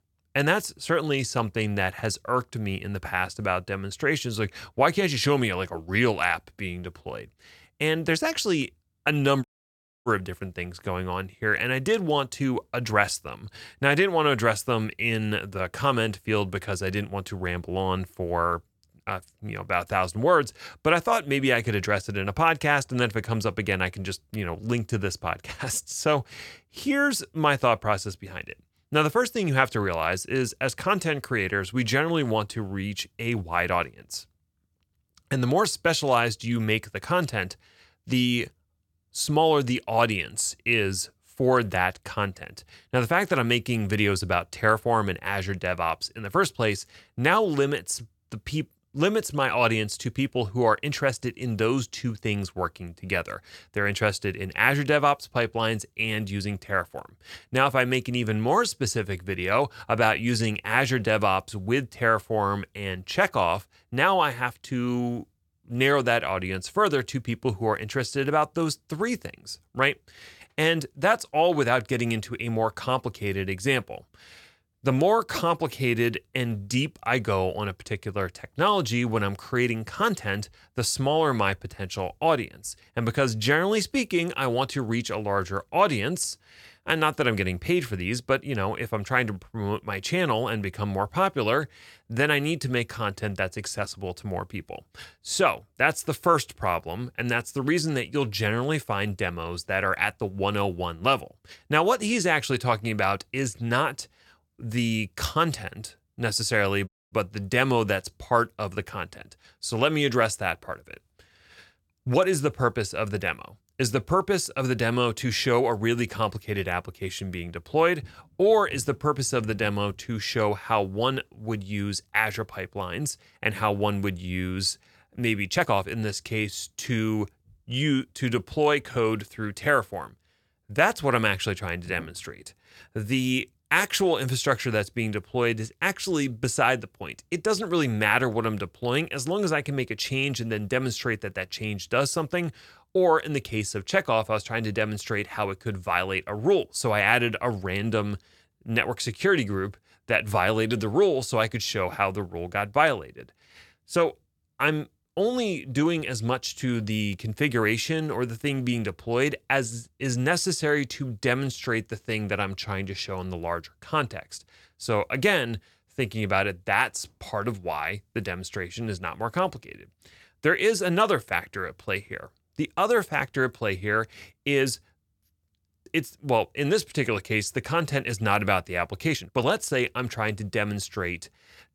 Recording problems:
audio cutting out; at 9.5 s for 0.5 s and at 1:47
uneven, jittery; slightly; from 24 s to 2:59

